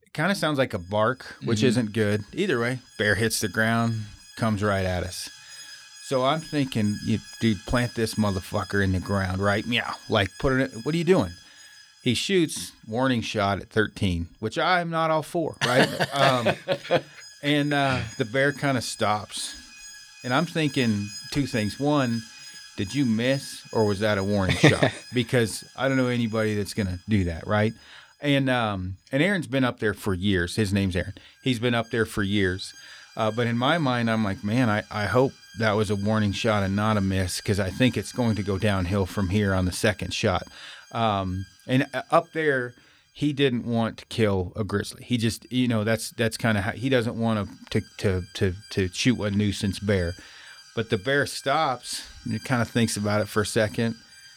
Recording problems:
alarms or sirens; noticeable; throughout; 20 dB below the speech

